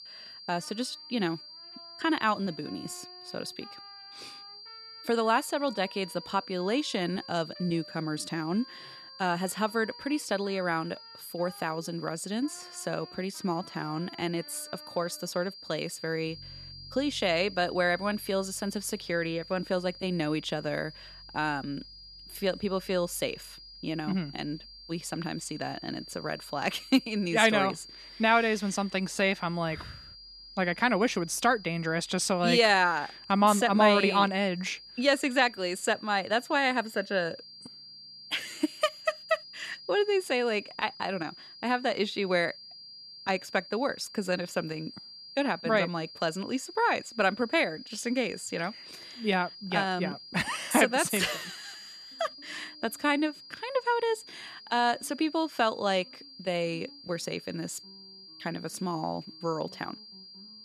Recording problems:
high-pitched whine; noticeable; throughout; 4.5 kHz, 15 dB below the speech
background music; faint; throughout; 30 dB below the speech

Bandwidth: 13.5 kHz